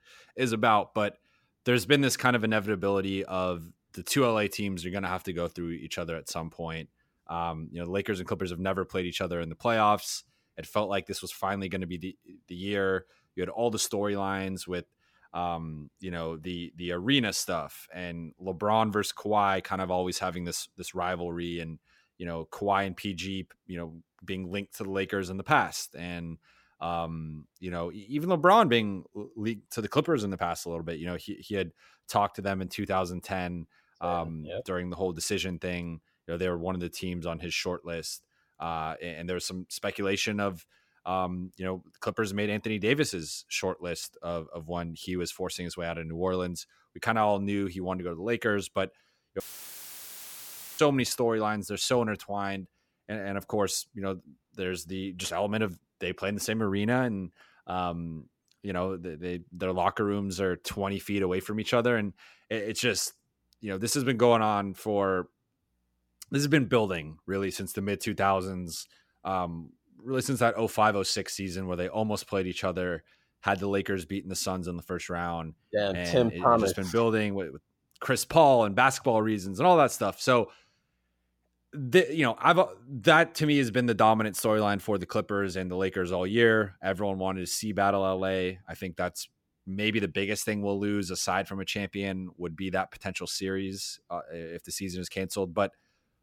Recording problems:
audio cutting out; filled with static; at 49 s for 1.5 s

